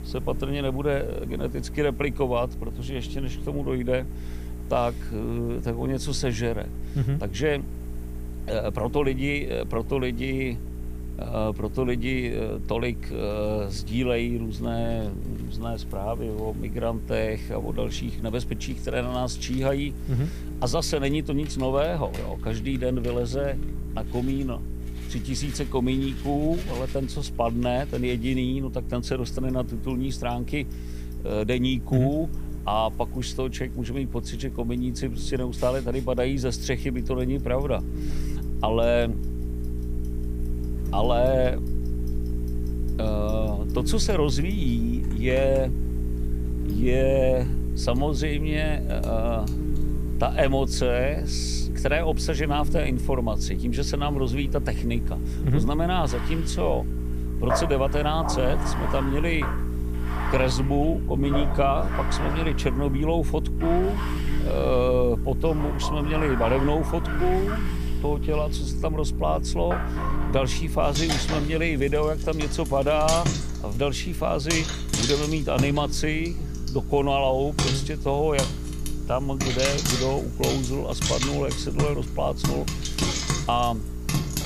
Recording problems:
household noises; loud; throughout; 5 dB below the speech
electrical hum; noticeable; throughout; 60 Hz, 15 dB below the speech
hiss; faint; throughout; 25 dB below the speech

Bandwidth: 15 kHz